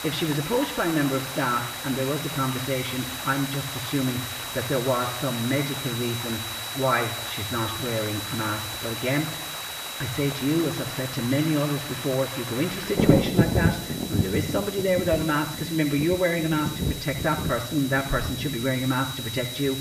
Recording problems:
muffled; slightly; fading above 3 kHz
room echo; slight; dies away in 0.8 s
off-mic speech; somewhat distant
high-pitched whine; loud; throughout; 4 kHz, 9 dB below the speech
rain or running water; loud; throughout; 5 dB below the speech
hiss; loud; throughout; 8 dB below the speech

